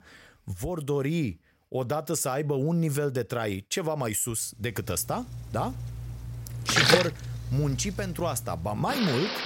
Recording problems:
rain or running water; very loud; from 5 s on; as loud as the speech

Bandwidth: 16 kHz